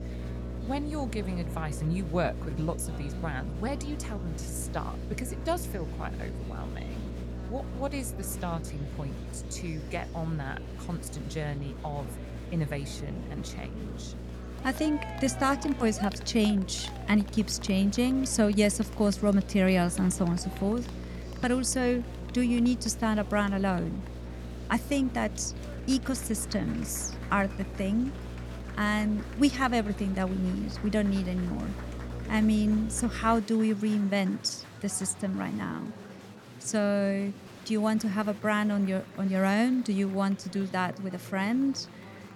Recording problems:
electrical hum; noticeable; until 33 s; 60 Hz, 15 dB below the speech
murmuring crowd; noticeable; throughout; 15 dB below the speech

